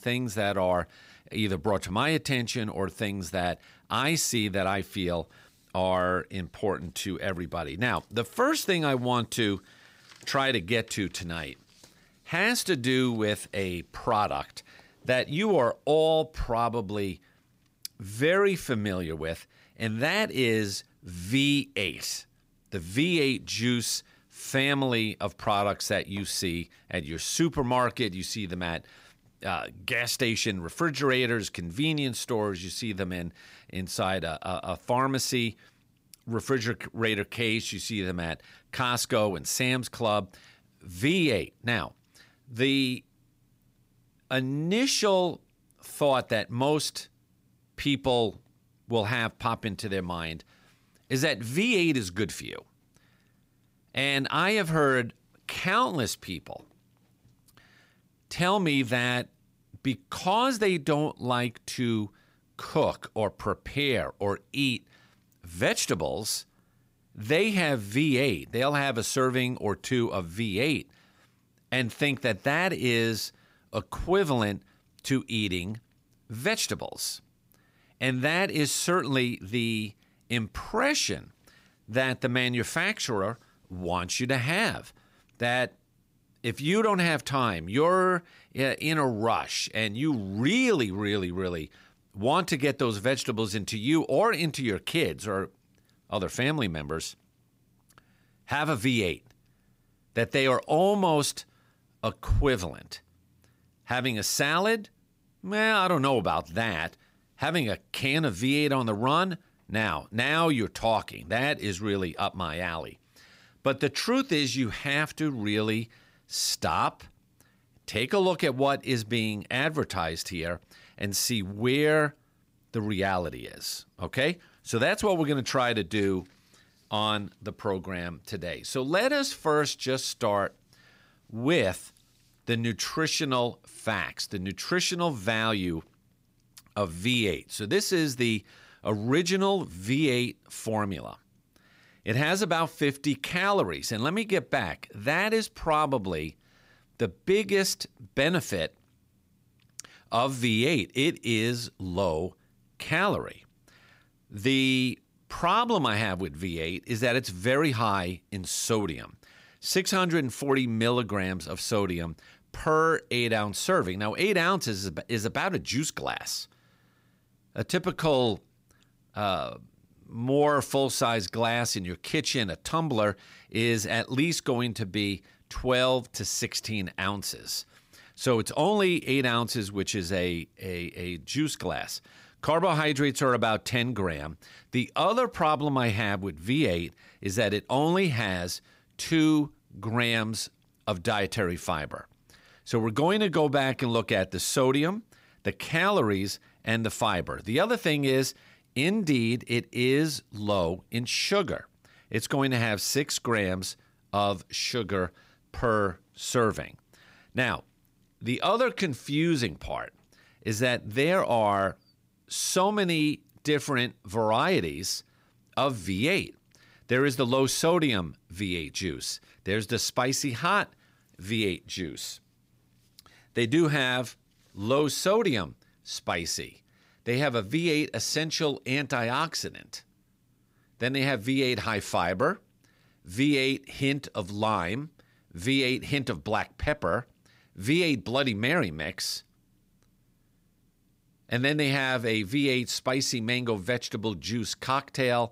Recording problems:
none

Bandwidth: 15.5 kHz